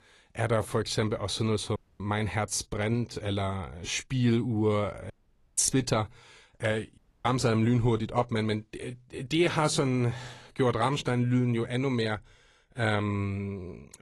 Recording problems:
garbled, watery; slightly; nothing above 11 kHz
audio cutting out; at 2 s, at 5 s and at 7 s

